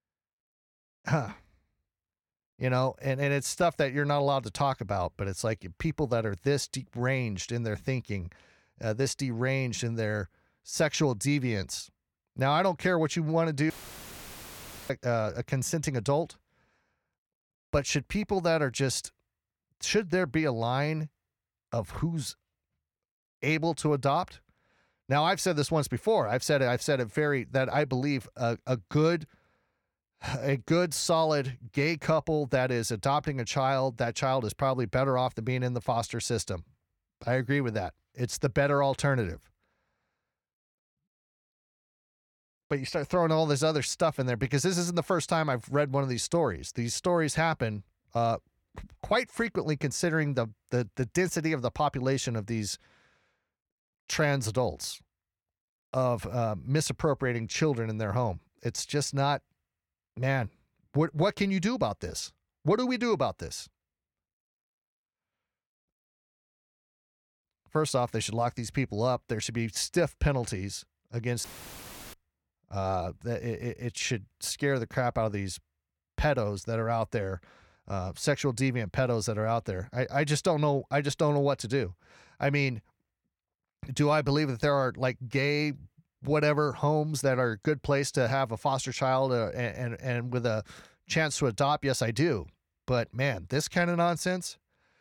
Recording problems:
audio cutting out; filled with static; at 14 s for 1 s and at 1:11 for 0.5 s

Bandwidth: 18 kHz